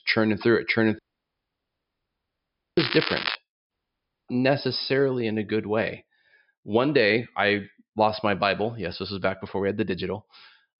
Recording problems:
high frequencies cut off; noticeable; nothing above 5.5 kHz
crackling; loud; at 3 s; 4 dB below the speech
audio cutting out; at 1 s for 2 s and at 3.5 s for 0.5 s

